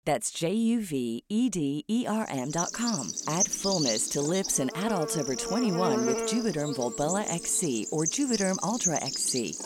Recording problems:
animal sounds; loud; from 2.5 s on; 2 dB below the speech

